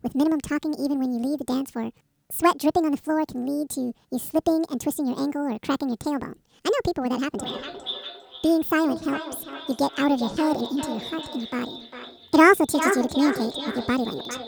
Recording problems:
echo of what is said; strong; from 7.5 s on; 400 ms later, 8 dB below the speech
wrong speed and pitch; too fast and too high; 1.7 times normal speed

